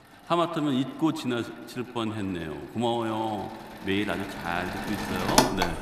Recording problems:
echo of what is said; strong; throughout; 100 ms later, 10 dB below the speech
machinery noise; very loud; throughout; 1 dB above the speech

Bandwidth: 14.5 kHz